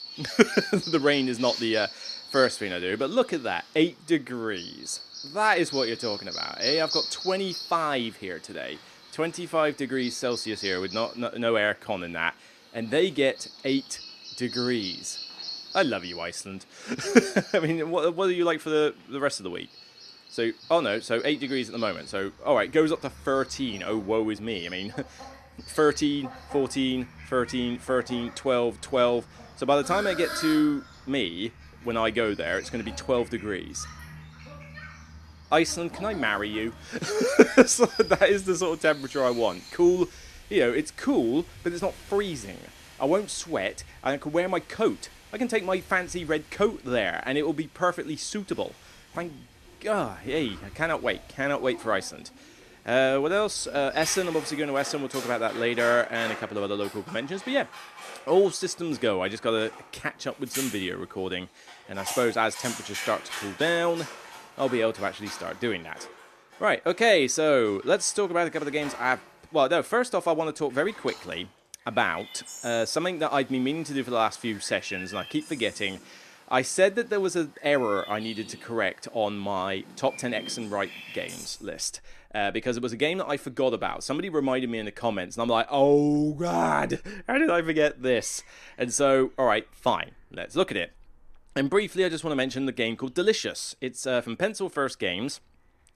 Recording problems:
animal sounds; noticeable; throughout; 10 dB below the speech

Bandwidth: 13.5 kHz